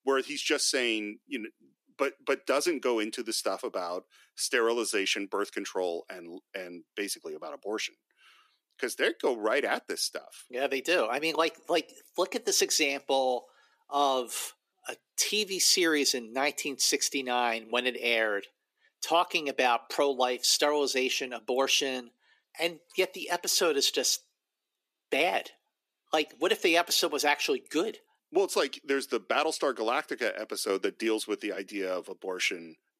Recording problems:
thin; somewhat; fading below 350 Hz

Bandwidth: 14.5 kHz